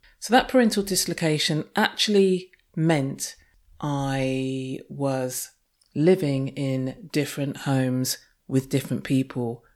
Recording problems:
none

